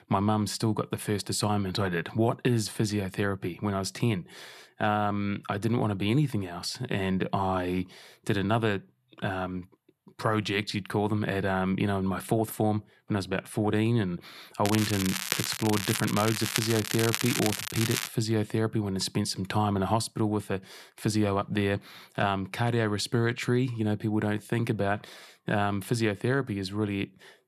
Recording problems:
crackling; loud; from 15 to 18 s; 2 dB below the speech

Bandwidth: 13.5 kHz